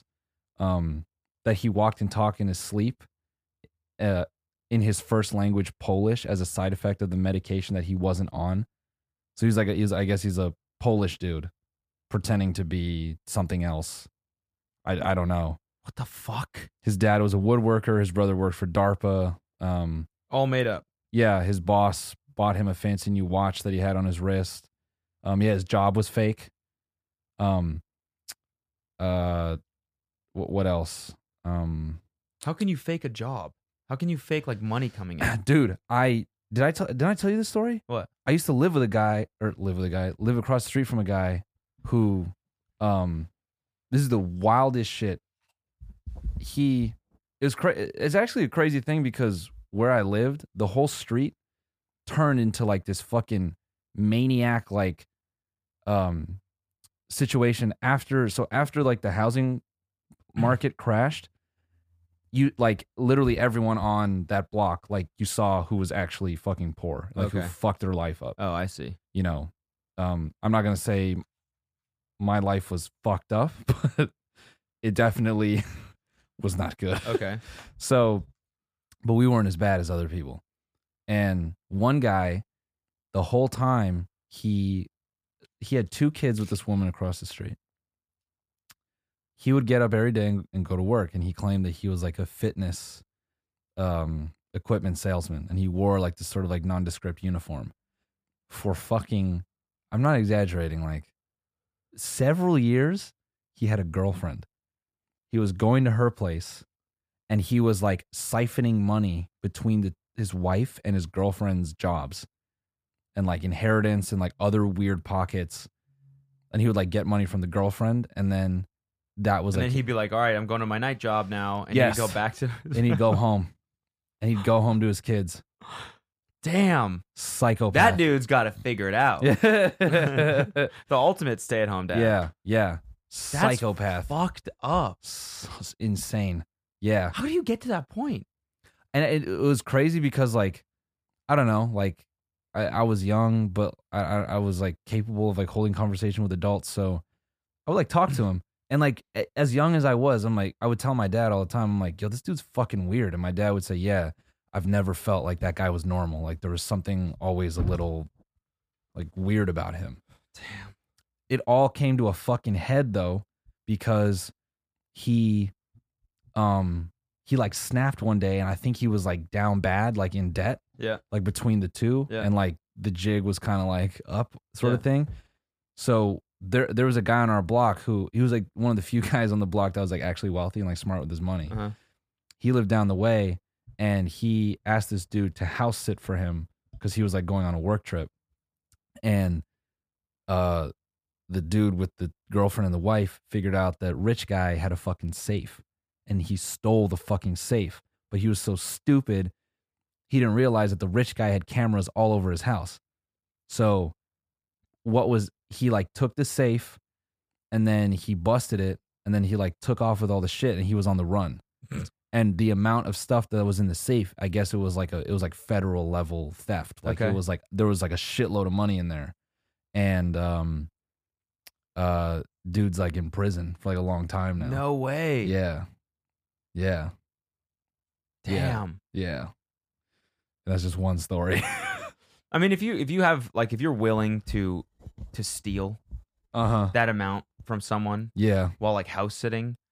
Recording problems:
none

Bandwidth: 15 kHz